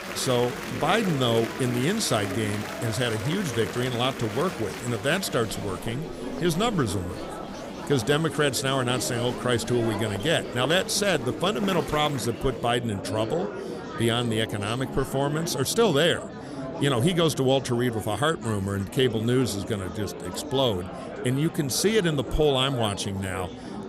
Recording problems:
murmuring crowd; loud; throughout; 9 dB below the speech

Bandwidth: 15.5 kHz